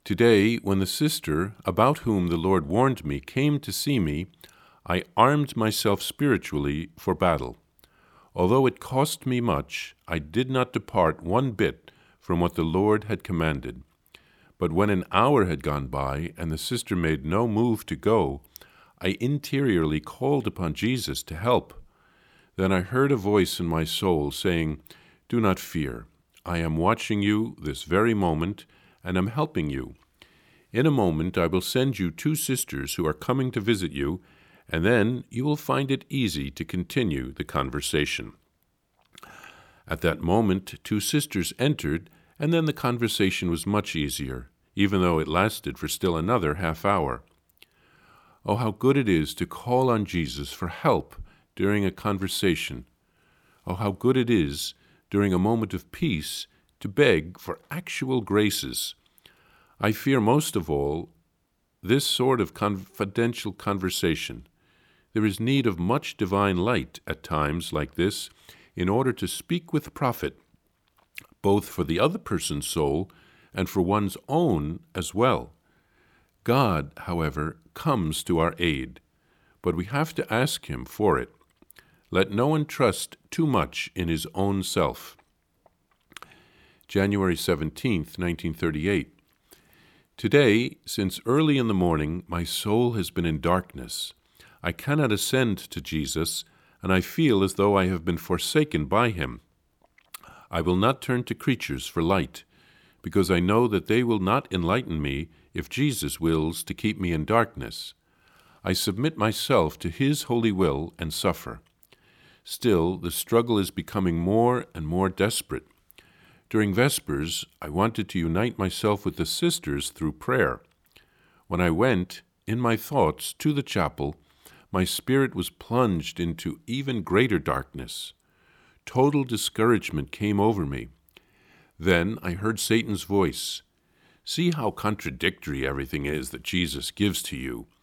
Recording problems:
none

